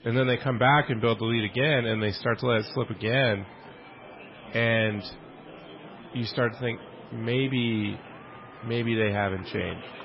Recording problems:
garbled, watery; badly; nothing above 5.5 kHz
distortion; slight; 10 dB below the speech
murmuring crowd; noticeable; throughout; 20 dB below the speech

